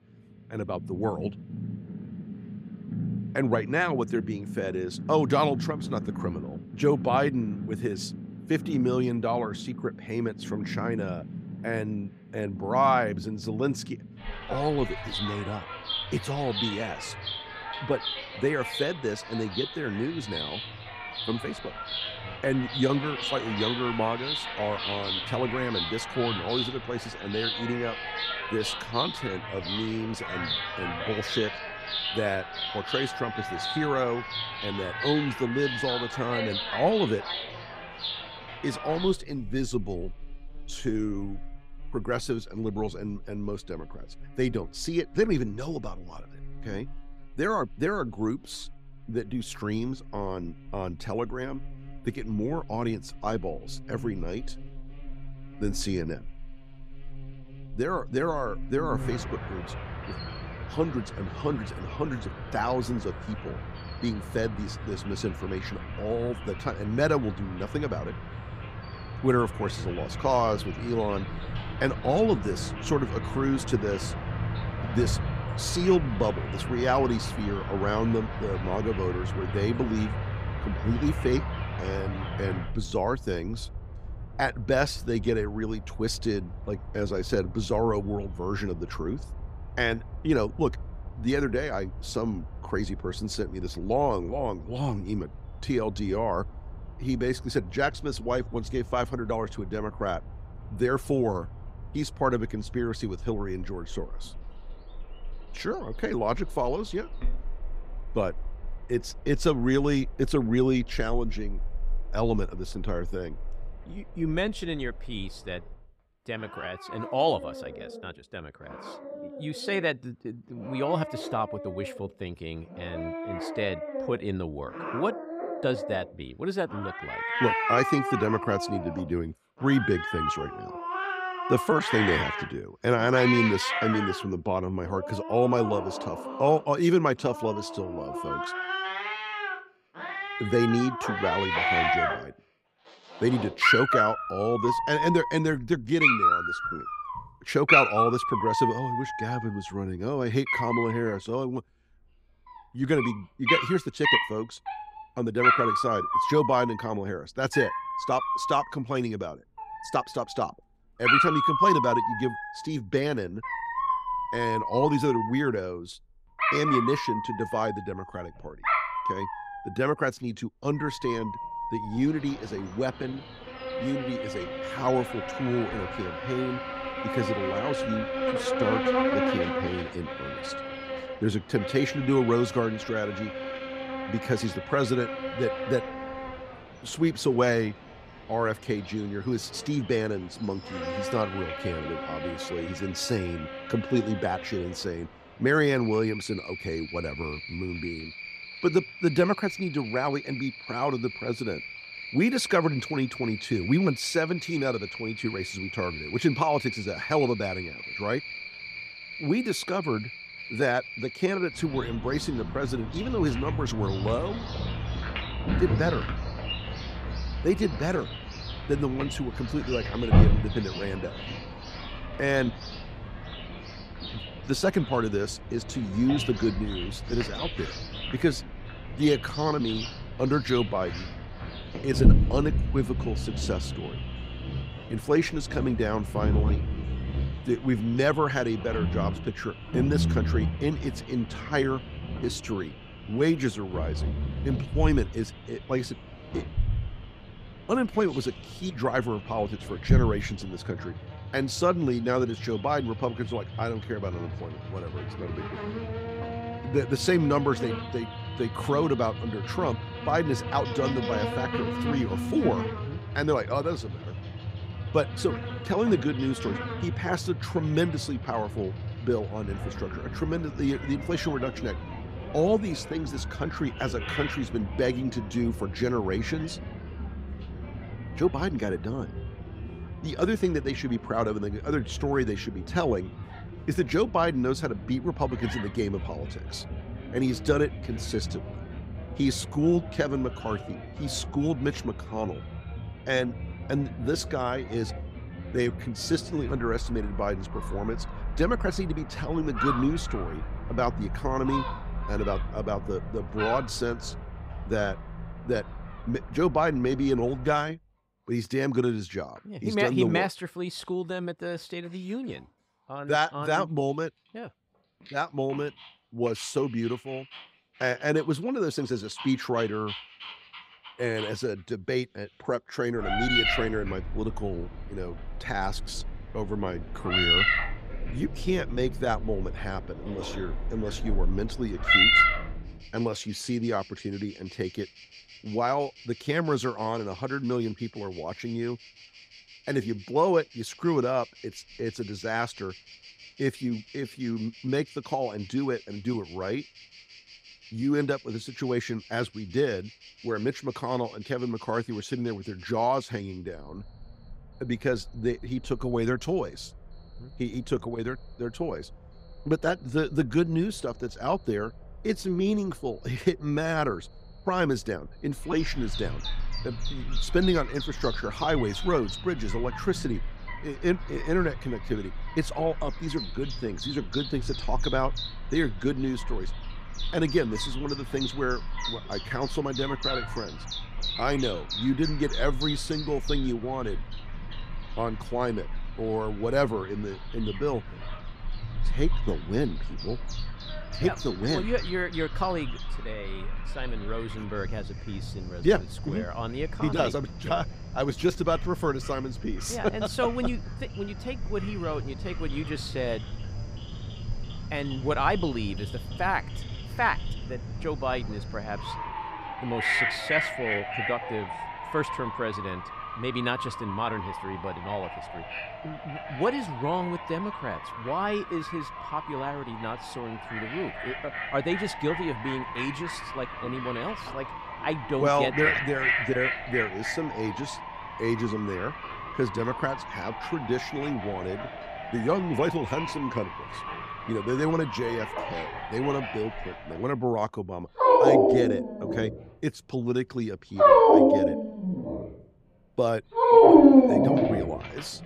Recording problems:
animal sounds; loud; throughout; 2 dB below the speech

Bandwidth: 15.5 kHz